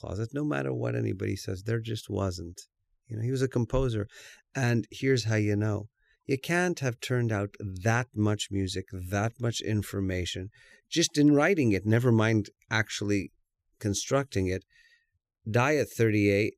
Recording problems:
none

